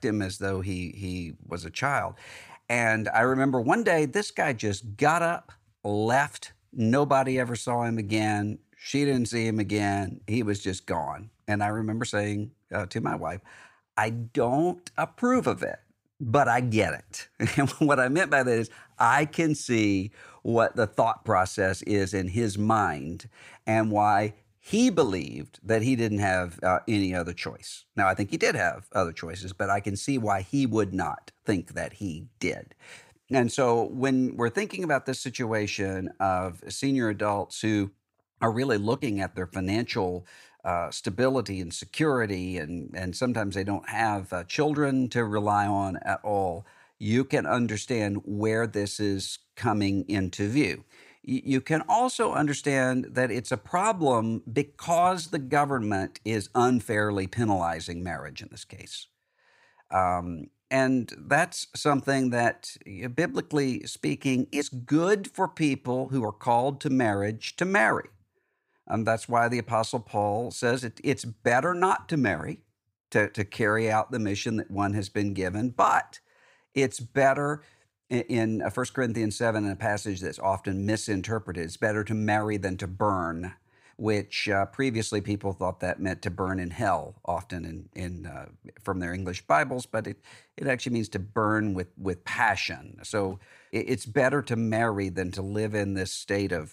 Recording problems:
none

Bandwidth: 15.5 kHz